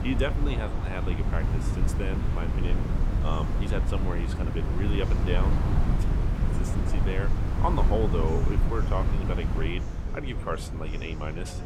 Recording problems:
wind noise on the microphone; heavy; 4 dB below the speech
murmuring crowd; noticeable; throughout; 10 dB below the speech

